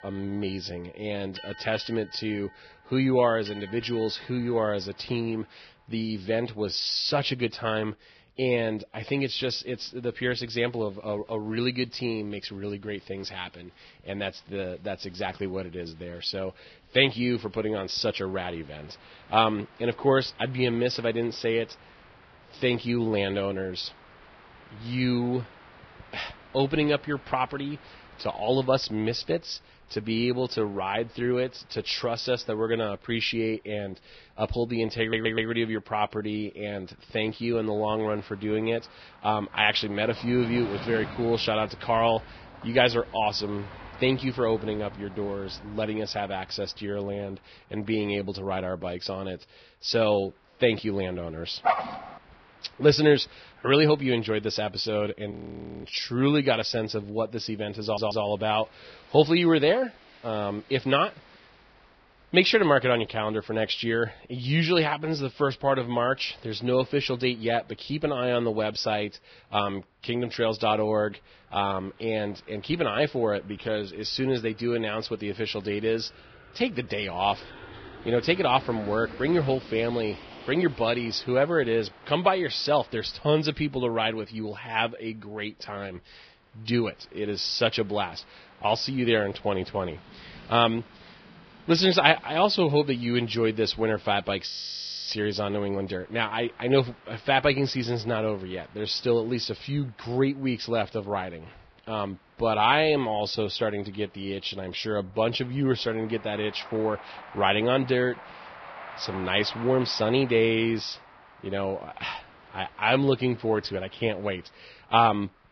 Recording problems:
garbled, watery; badly; nothing above 5.5 kHz
train or aircraft noise; faint; throughout; 20 dB below the speech
audio stuttering; at 35 s and at 58 s
dog barking; loud; at 52 s; peak 1 dB above the speech
audio freezing; at 55 s for 0.5 s and at 1:34 for 0.5 s

